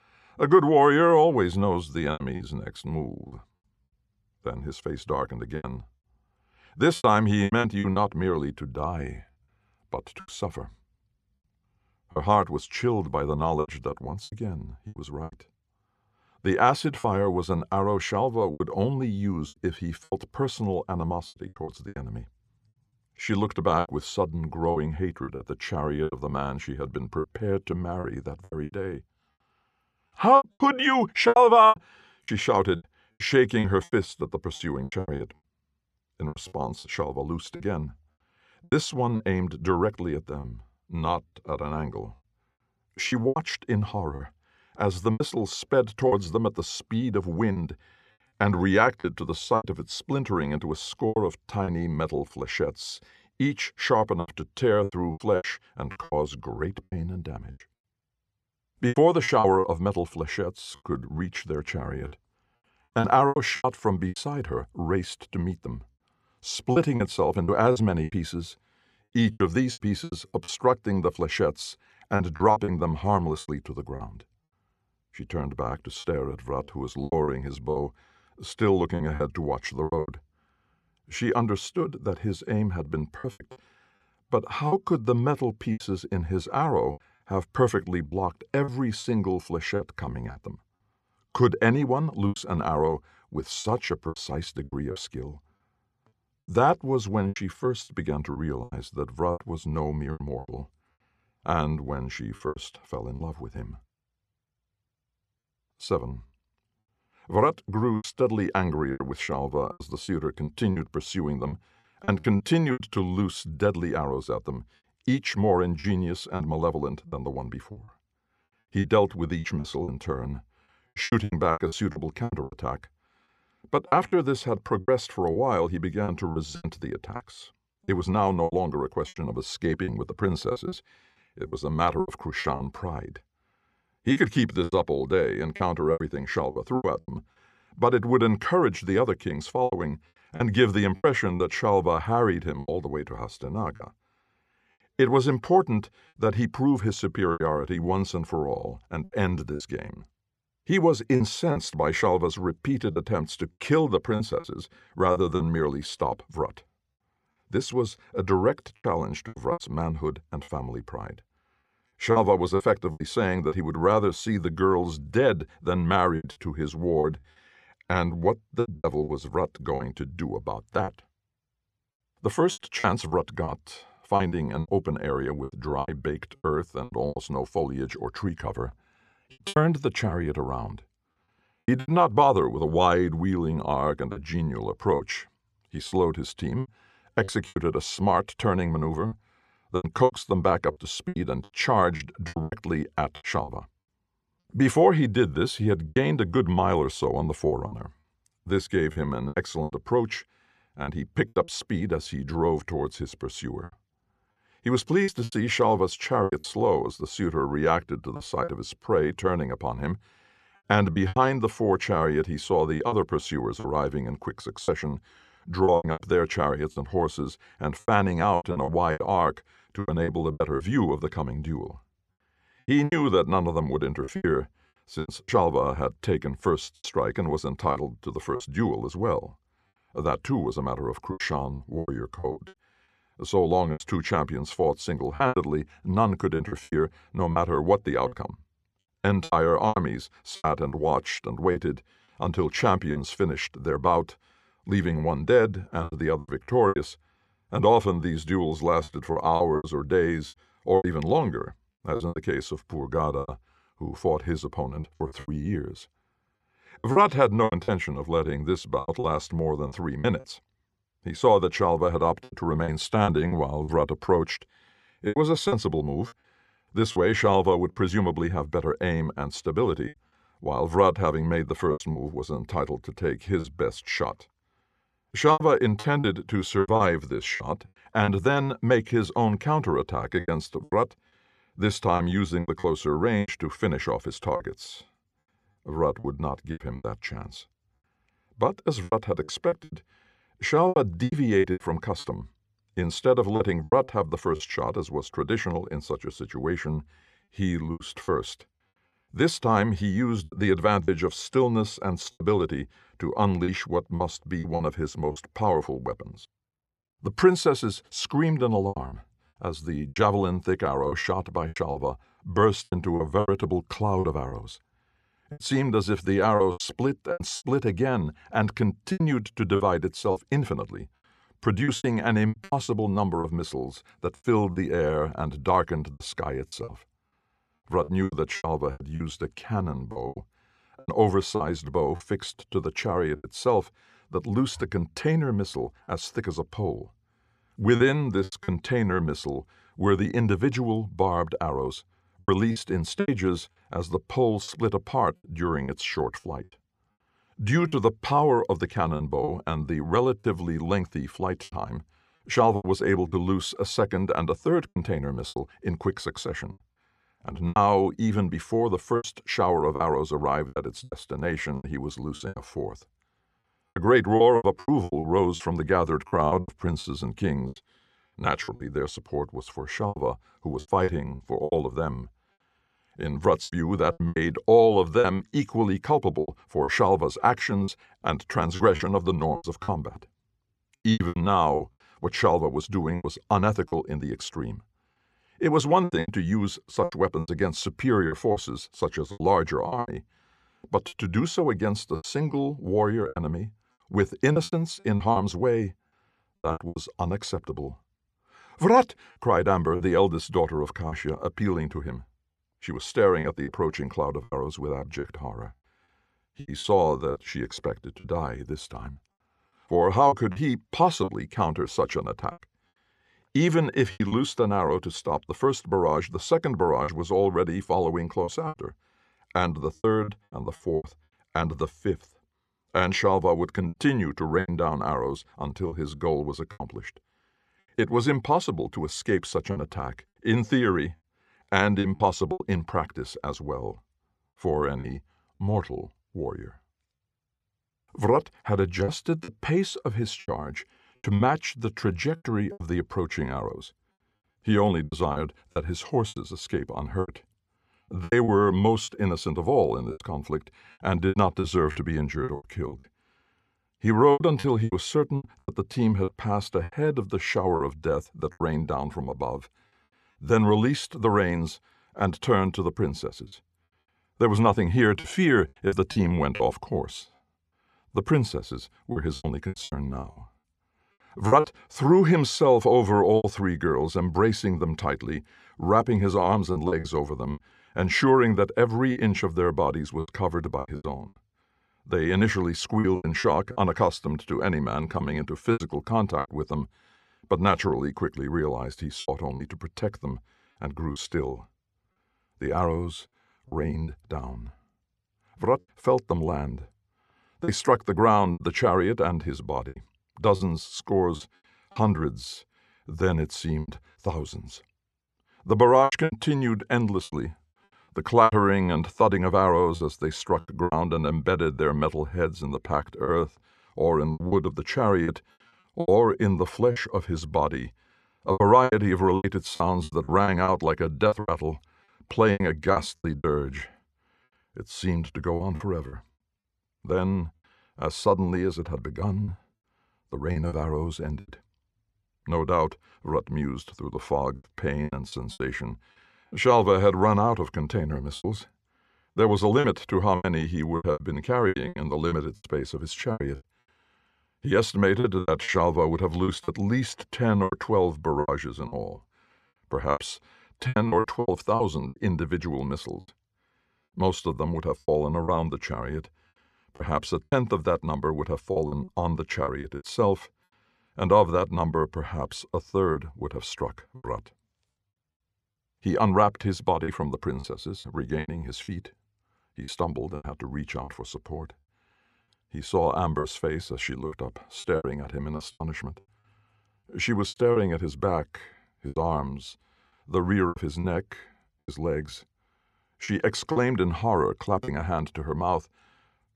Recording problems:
choppy; very; 9% of the speech affected

